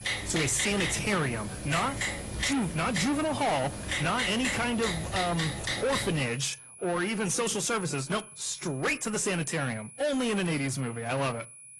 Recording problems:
distortion; heavy; 6 dB below the speech
garbled, watery; slightly
high-pitched whine; noticeable; throughout; 10 kHz, 15 dB below the speech
keyboard typing; loud; until 6 s; peak level with the speech

